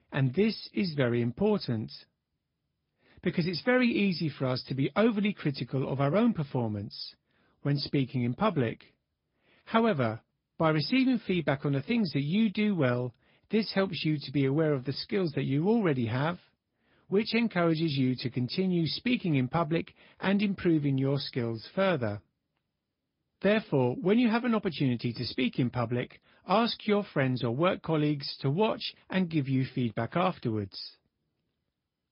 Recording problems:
high frequencies cut off; noticeable; nothing above 5 kHz
garbled, watery; slightly

